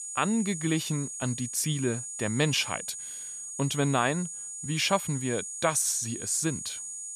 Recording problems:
high-pitched whine; loud; throughout; 7 kHz, 7 dB below the speech

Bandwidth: 15 kHz